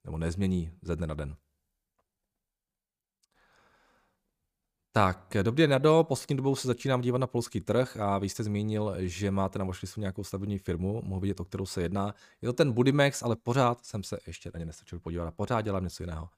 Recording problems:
none

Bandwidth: 15 kHz